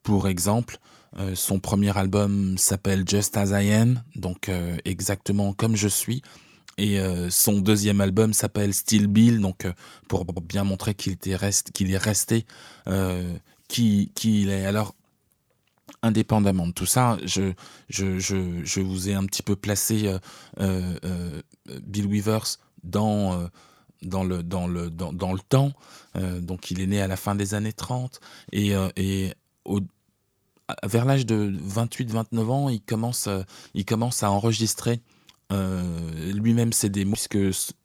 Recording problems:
audio stuttering; at 10 s

